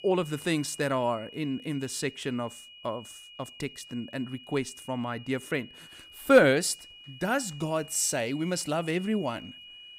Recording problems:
high-pitched whine; noticeable; throughout; 3 kHz, 20 dB below the speech

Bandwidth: 15.5 kHz